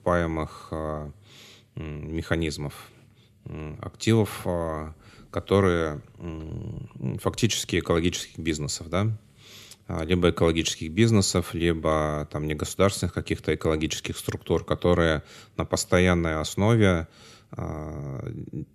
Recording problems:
none

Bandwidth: 14 kHz